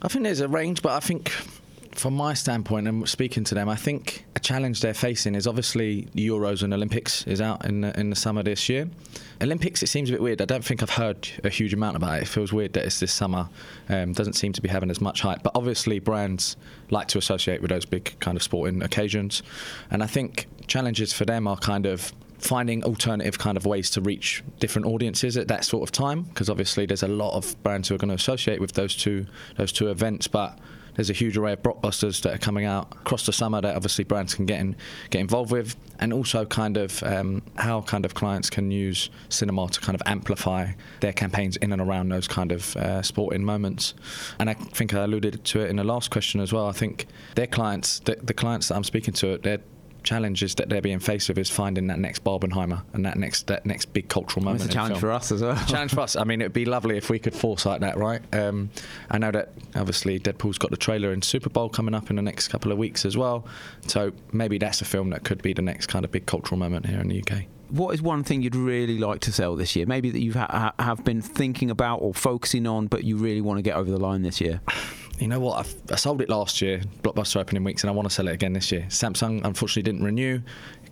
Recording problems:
squashed, flat; heavily

